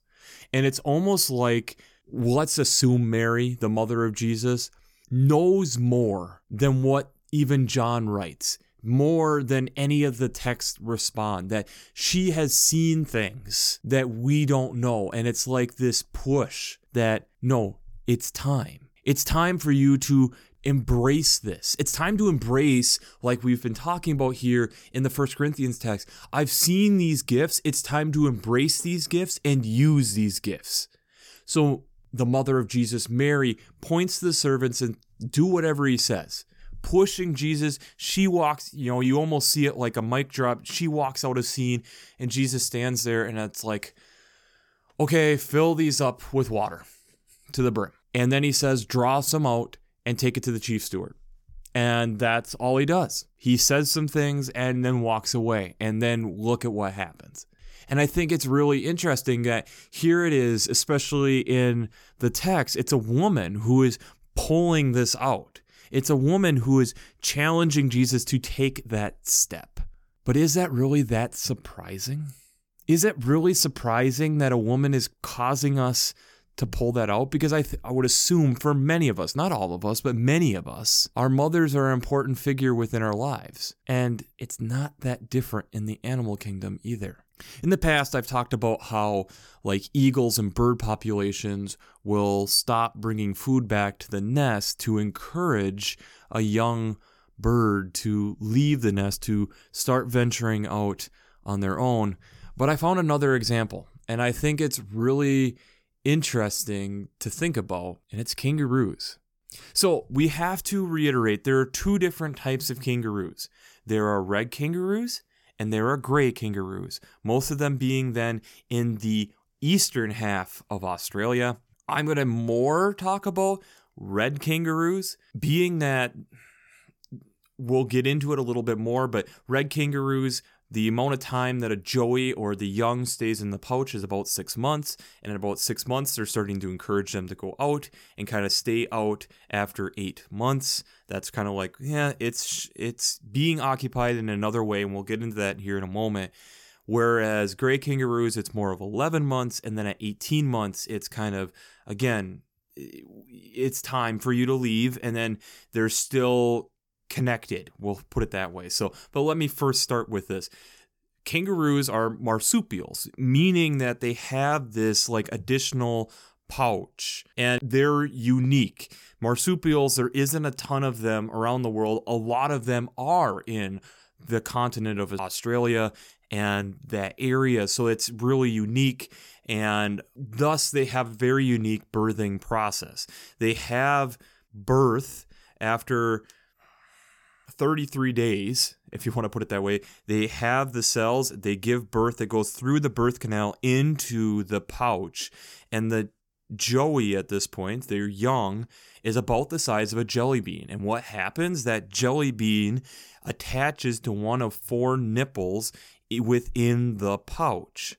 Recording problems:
none

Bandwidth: 18 kHz